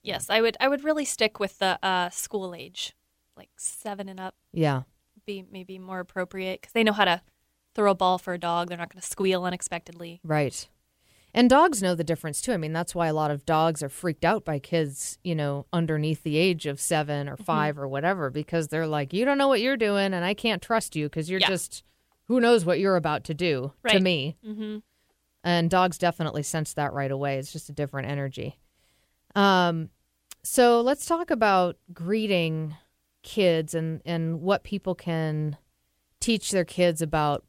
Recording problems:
none

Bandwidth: 16 kHz